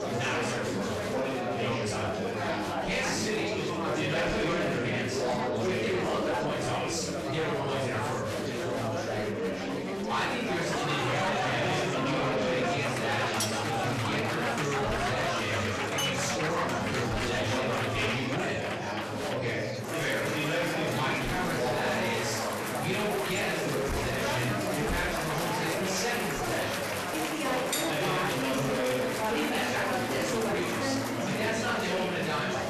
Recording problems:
off-mic speech; far
room echo; noticeable; dies away in 0.7 s
distortion; slight; 10 dB below the speech
chatter from many people; very loud; throughout; 1 dB above the speech
background music; very faint; throughout; 25 dB below the speech
clattering dishes; noticeable; at 13 s; peak 1 dB below the speech
clattering dishes; loud; at 16 s and at 28 s; peak level with the speech

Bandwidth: 13.5 kHz